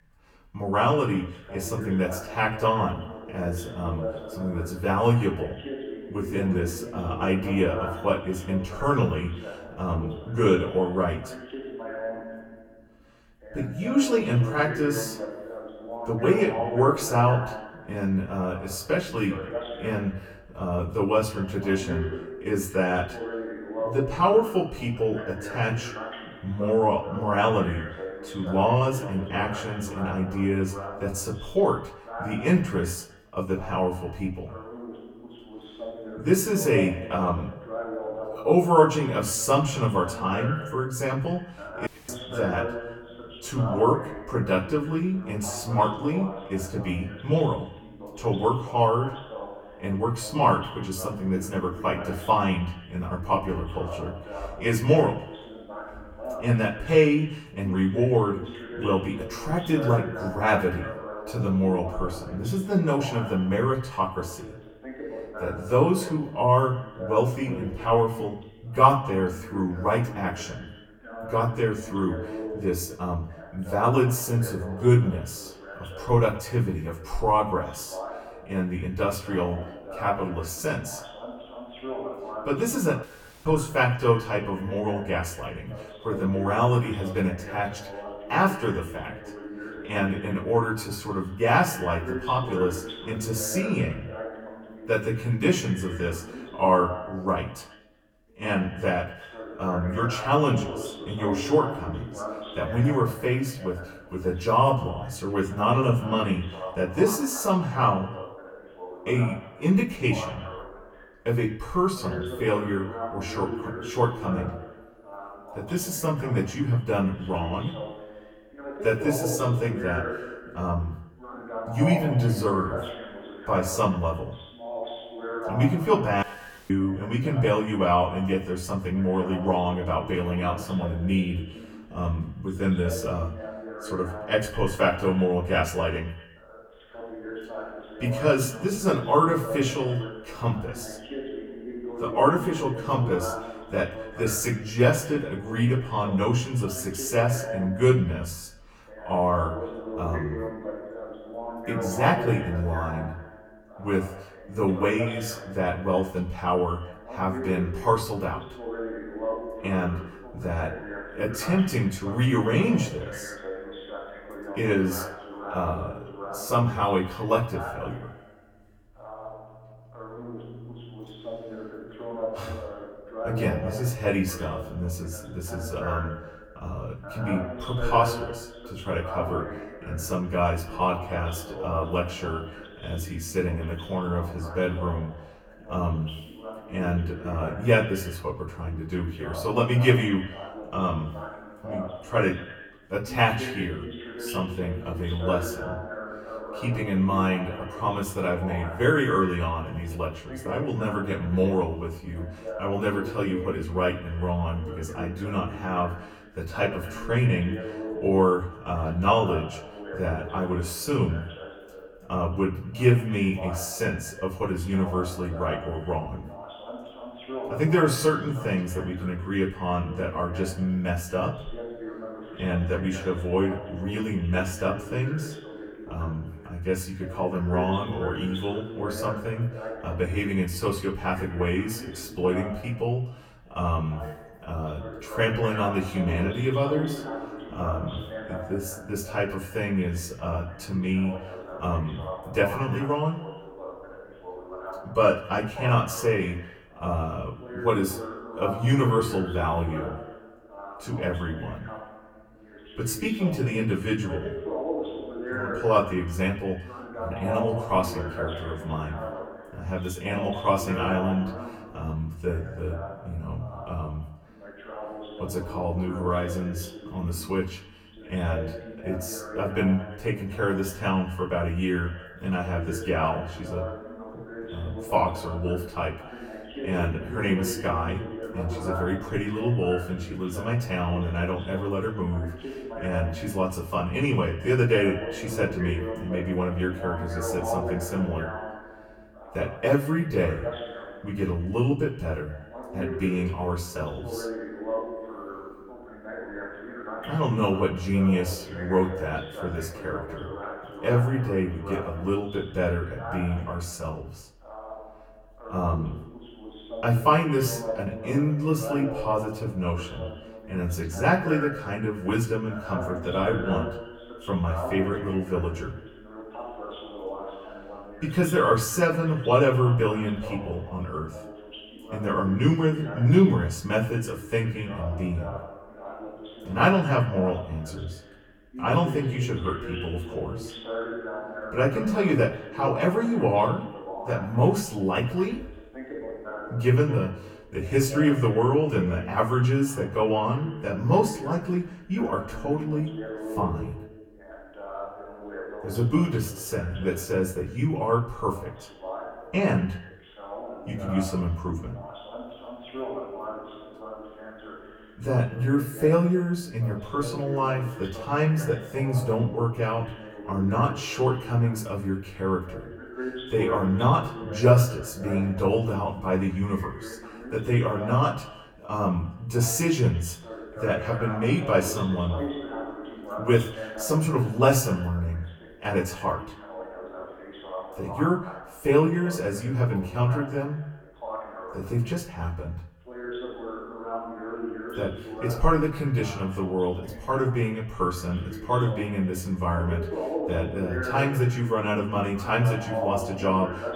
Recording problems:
off-mic speech; far
echo of what is said; faint; throughout; 110 ms later, 20 dB below the speech
room echo; slight; dies away in 0.3 s
voice in the background; noticeable; throughout; 10 dB below the speech
audio cutting out; at 42 s, at 1:23 and at 2:06

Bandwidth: 18 kHz